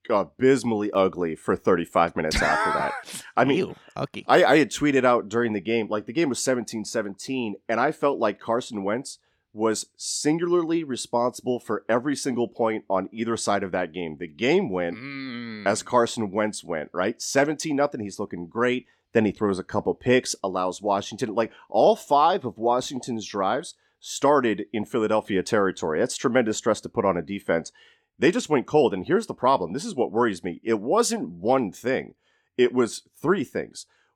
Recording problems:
none

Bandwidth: 17.5 kHz